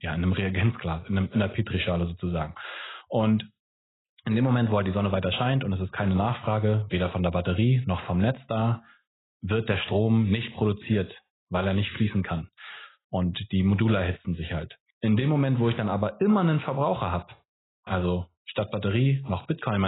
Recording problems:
garbled, watery; badly; nothing above 4 kHz
abrupt cut into speech; at the end

